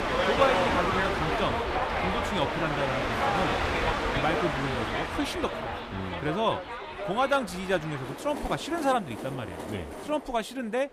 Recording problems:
train or aircraft noise; very loud; throughout; 1 dB above the speech

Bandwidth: 15 kHz